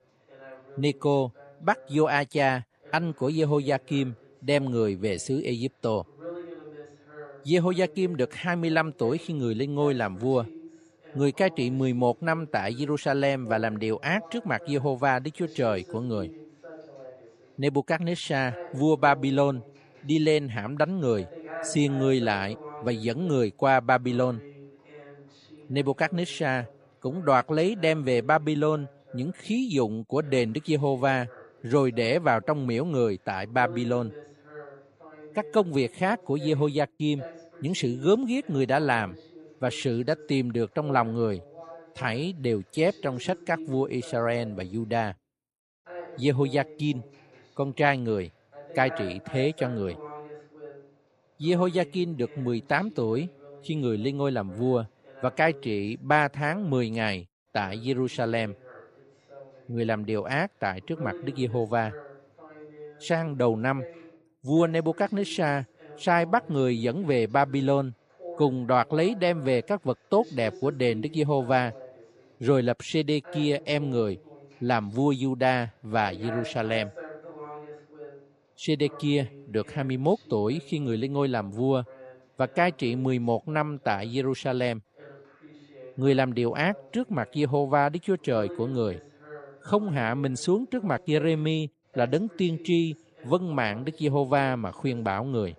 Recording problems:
voice in the background; noticeable; throughout; 20 dB below the speech

